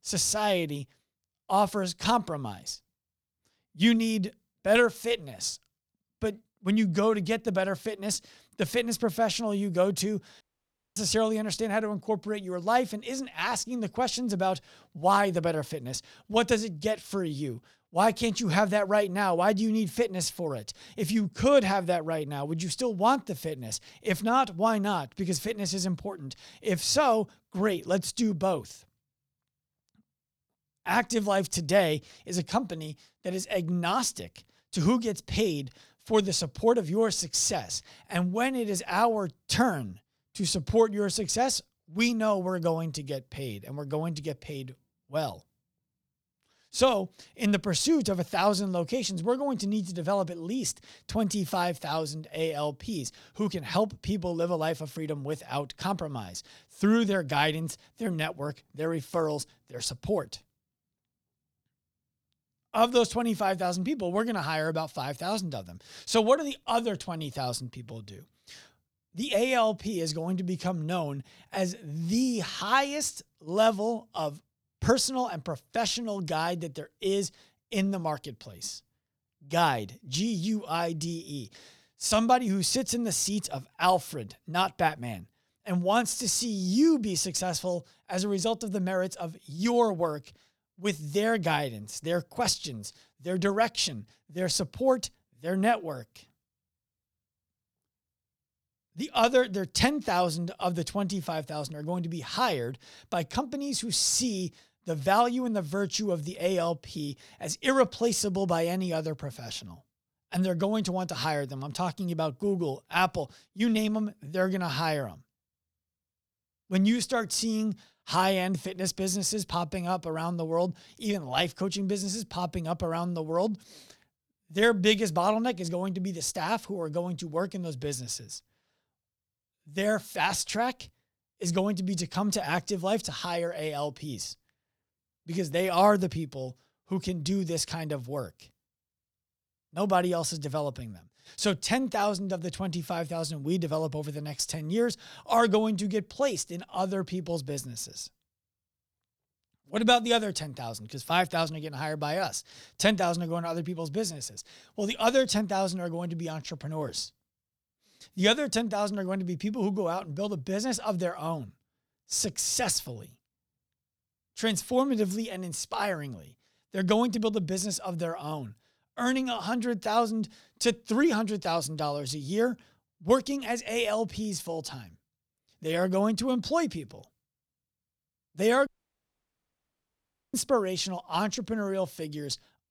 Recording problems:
audio cutting out; at 10 s for 0.5 s and at 2:59 for 1.5 s

